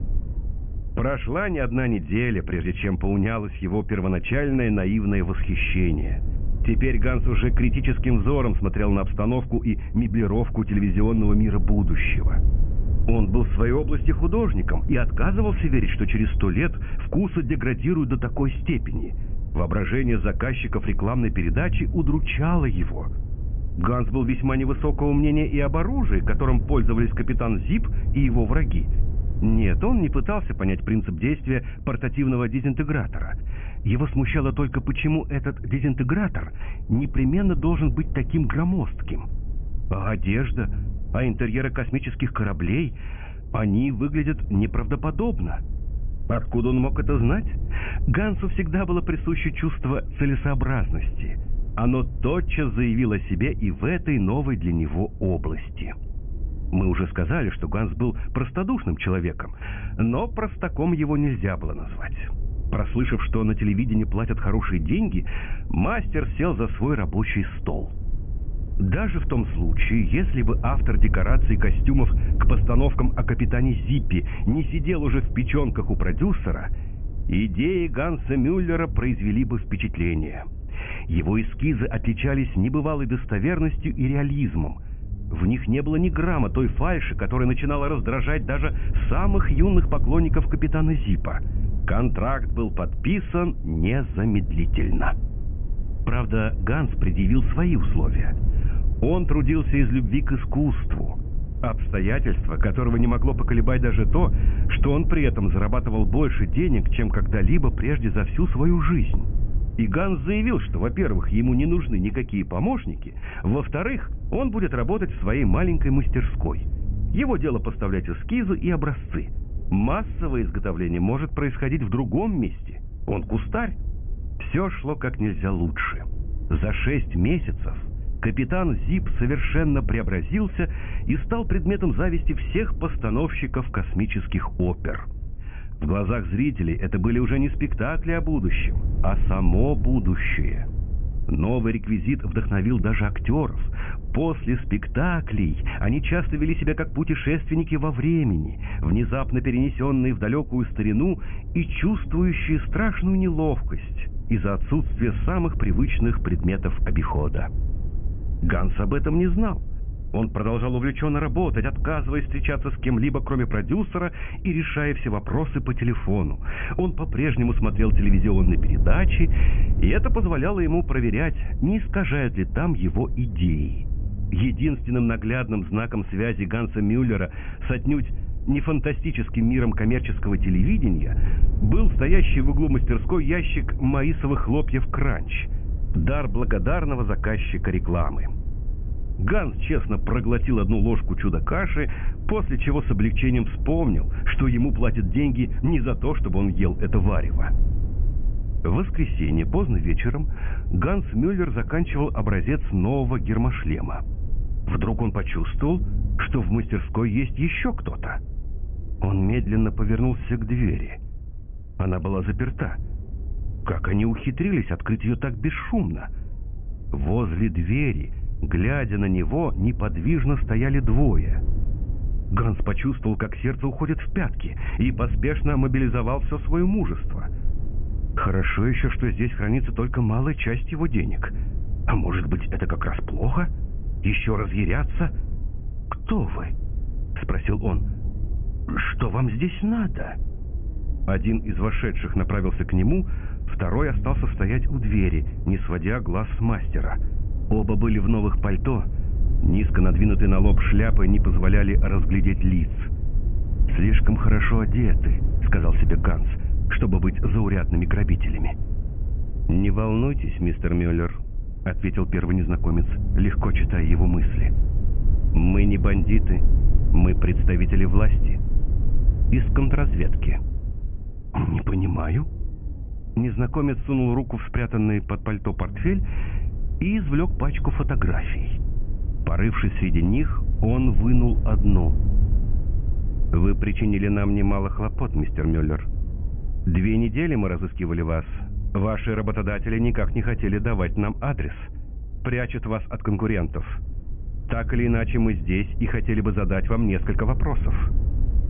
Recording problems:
high frequencies cut off; severe; nothing above 3.5 kHz
low rumble; noticeable; throughout; 15 dB below the speech

